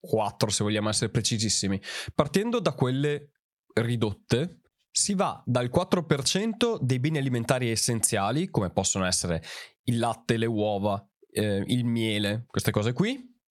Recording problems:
squashed, flat; somewhat

